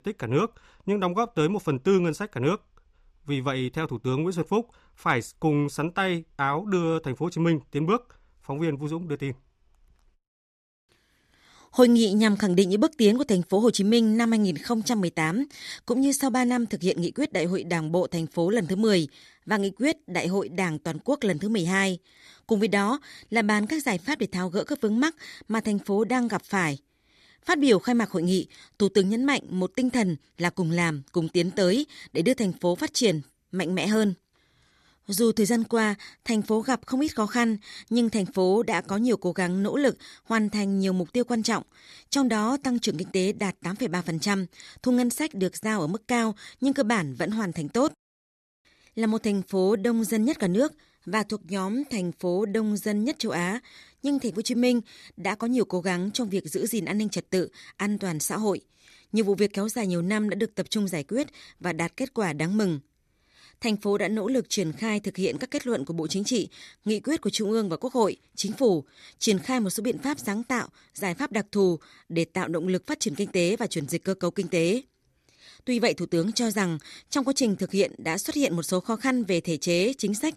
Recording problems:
none

